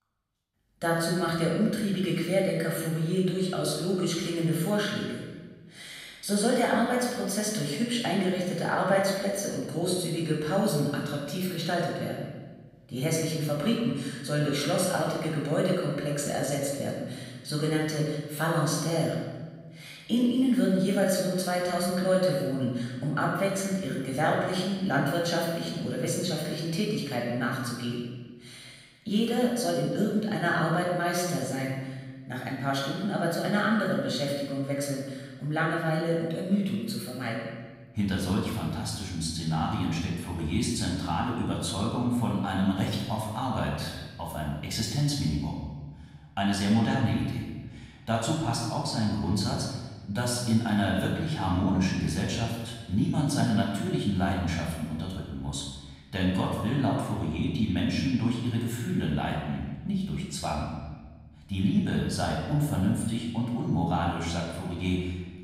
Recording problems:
off-mic speech; far
room echo; noticeable; dies away in 1.2 s

